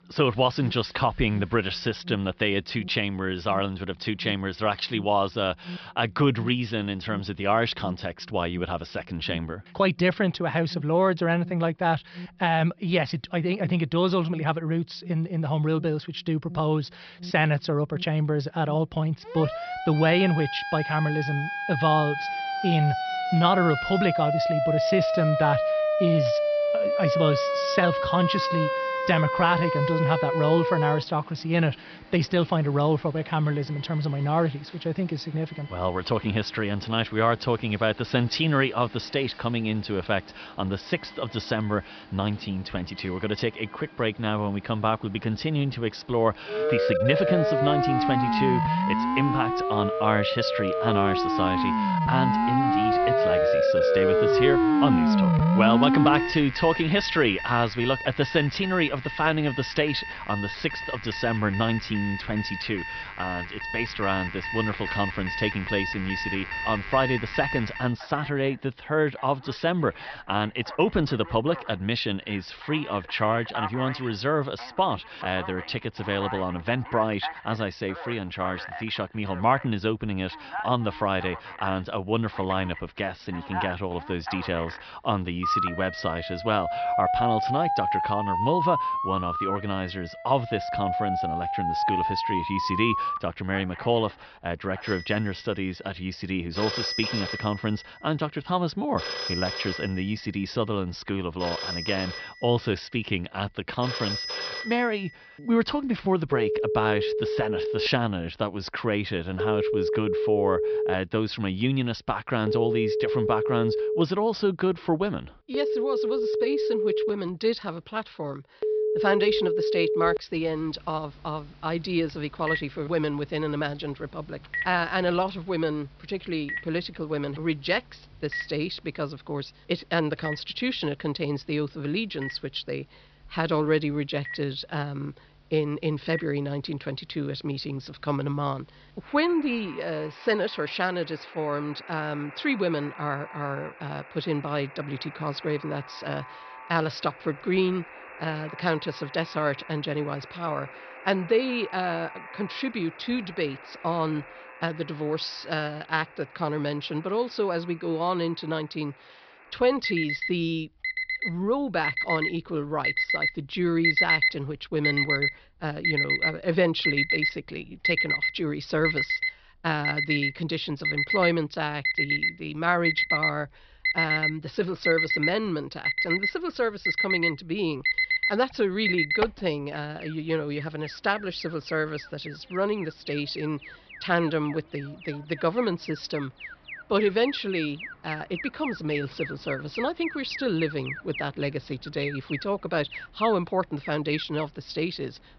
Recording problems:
high frequencies cut off; noticeable; nothing above 5.5 kHz
alarms or sirens; very loud; throughout; as loud as the speech

